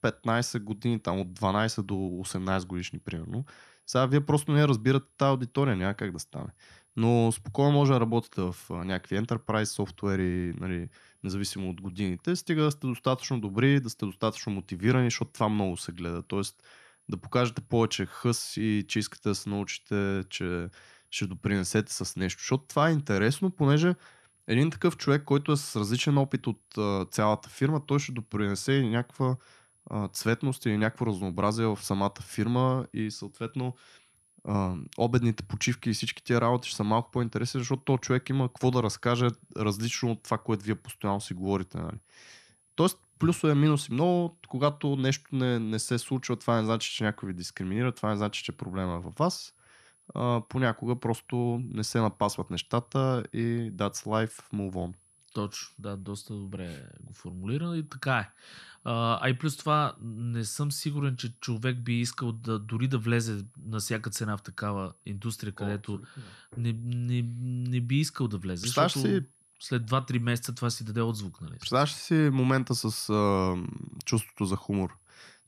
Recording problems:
high-pitched whine; faint; throughout; 10.5 kHz, 35 dB below the speech

